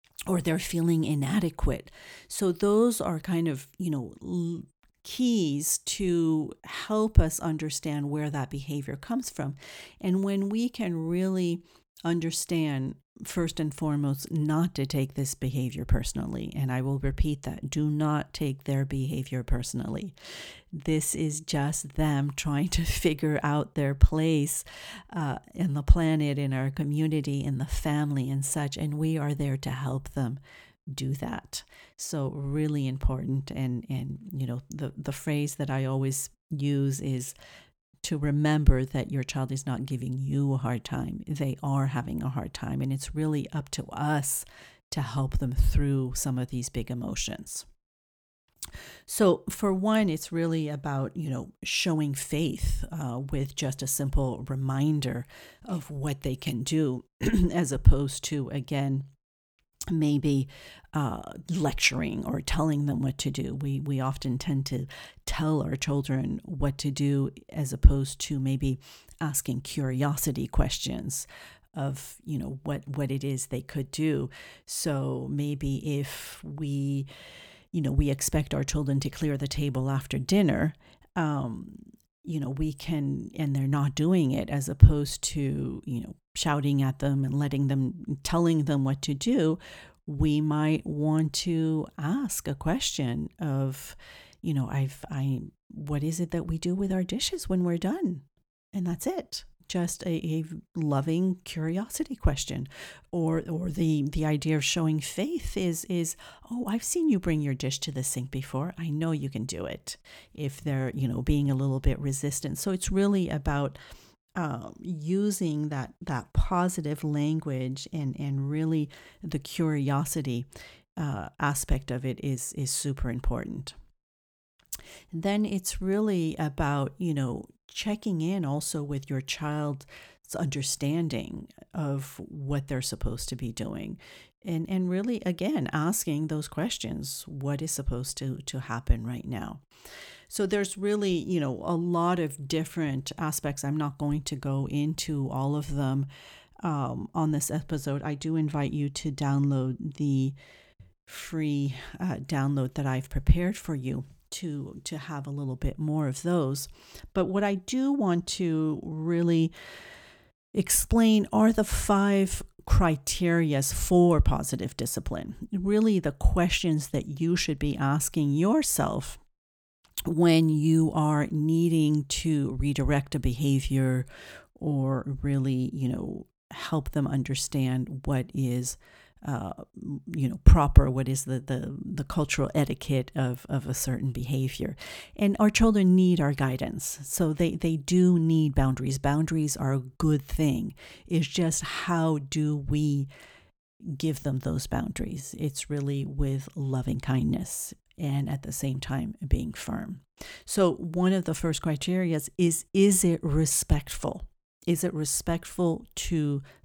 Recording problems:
none

